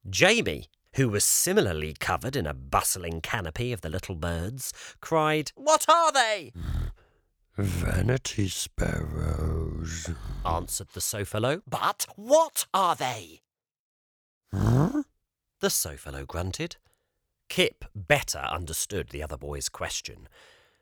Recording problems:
none

